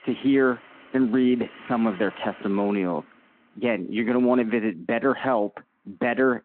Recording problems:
phone-call audio
traffic noise; faint; throughout; 20 dB below the speech

